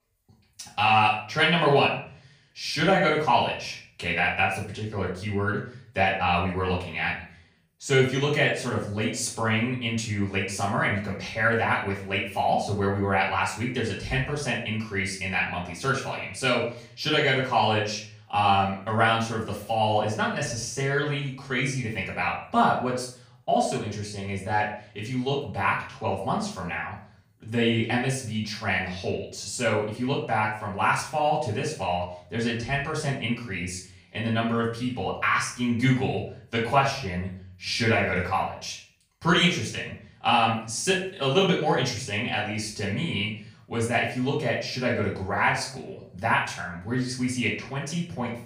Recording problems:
off-mic speech; far
room echo; noticeable; dies away in 0.4 s

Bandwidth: 15.5 kHz